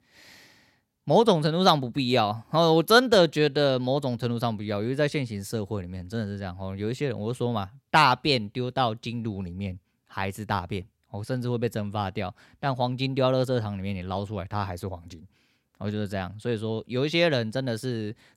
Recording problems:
none

